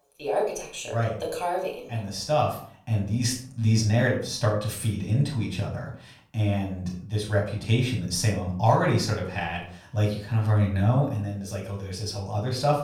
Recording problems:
off-mic speech; far
room echo; slight; dies away in 0.5 s

